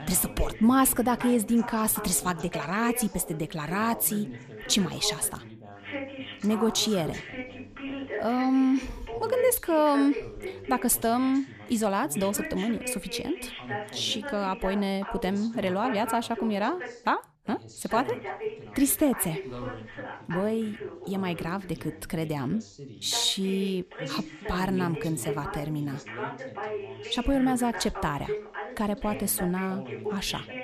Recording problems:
background chatter; noticeable; throughout; 2 voices, 10 dB below the speech

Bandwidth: 14.5 kHz